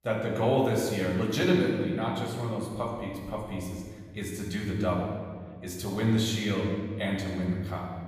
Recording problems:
off-mic speech; far
room echo; noticeable; dies away in 1.6 s

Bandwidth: 15 kHz